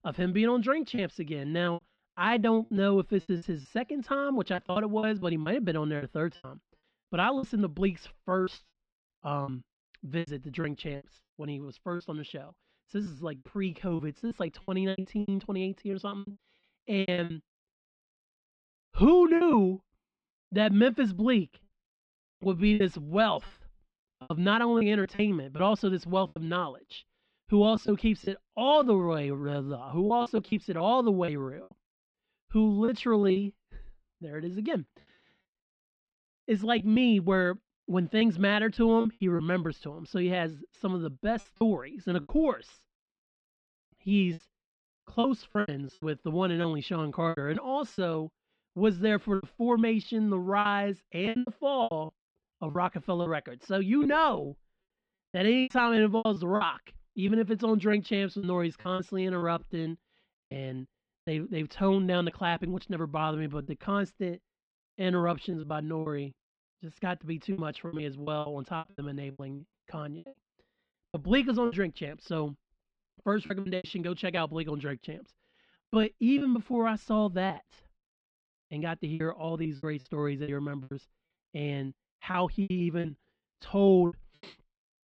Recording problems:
muffled; slightly; fading above 4 kHz
choppy; very; 10% of the speech affected

